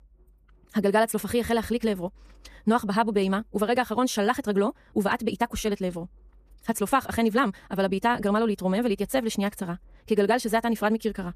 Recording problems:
wrong speed, natural pitch; too fast; 1.6 times normal speed

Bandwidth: 14.5 kHz